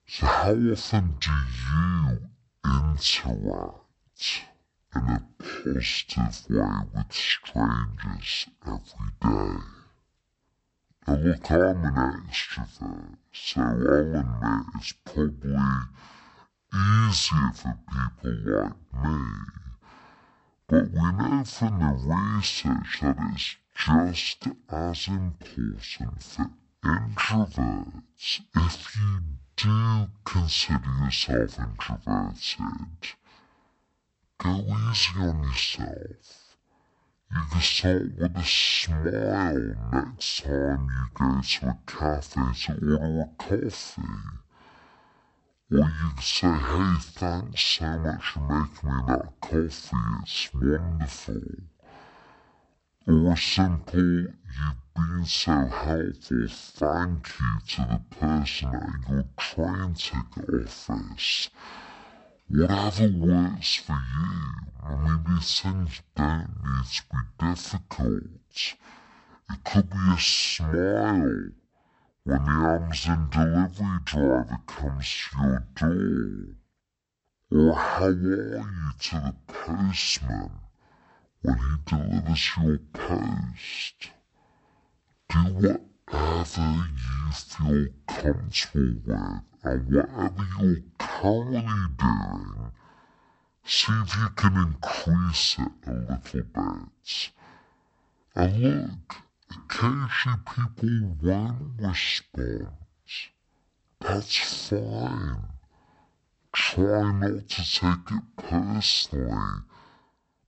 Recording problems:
wrong speed and pitch; too slow and too low; 0.5 times normal speed

